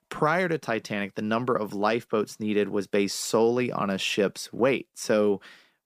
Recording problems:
none

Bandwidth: 15 kHz